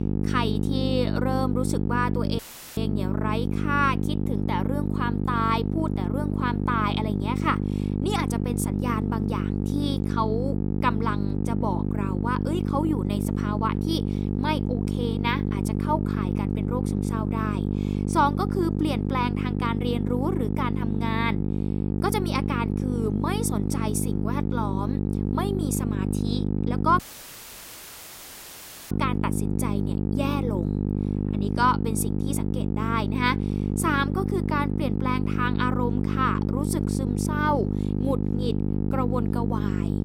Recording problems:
electrical hum; loud; throughout; 50 Hz, 5 dB below the speech
audio cutting out; filled with static; at 2.5 s and at 27 s for 2 s

